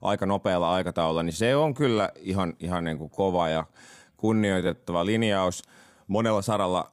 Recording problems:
uneven, jittery; strongly; from 1.5 to 5 s

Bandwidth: 15 kHz